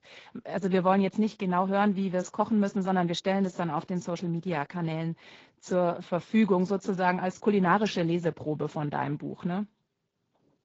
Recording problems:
garbled, watery; slightly; nothing above 7.5 kHz
high frequencies cut off; slight

